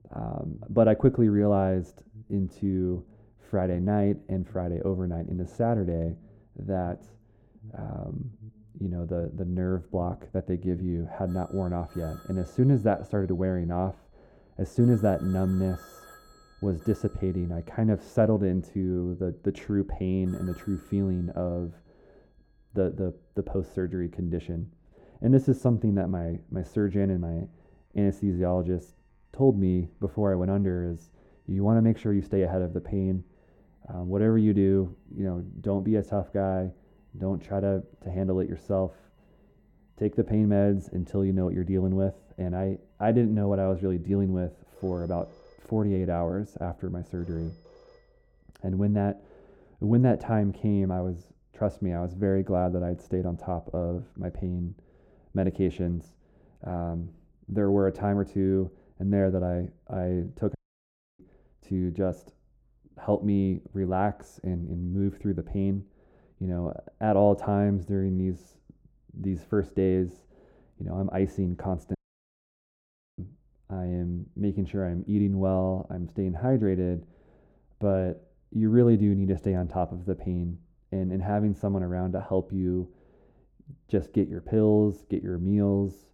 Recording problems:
muffled; very; fading above 1 kHz
alarms or sirens; faint; until 49 s; 25 dB below the speech
audio cutting out; at 1:01 for 0.5 s and at 1:12 for 1 s

